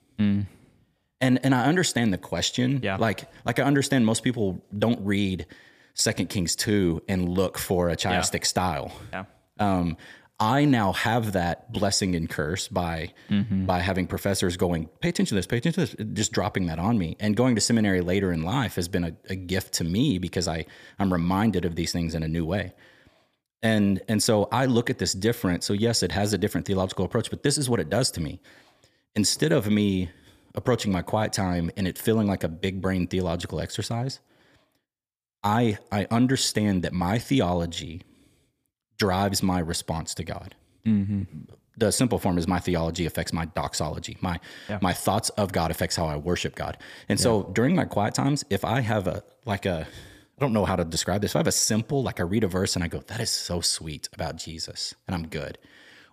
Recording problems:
none

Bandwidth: 15 kHz